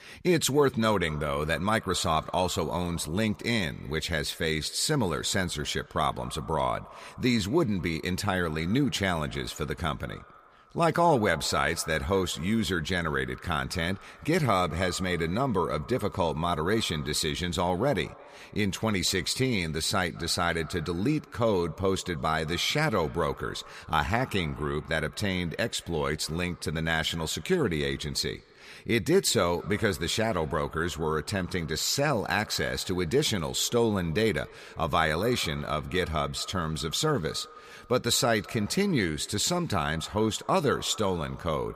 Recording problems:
echo of what is said; faint; throughout; 210 ms later, 20 dB below the speech

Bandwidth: 15 kHz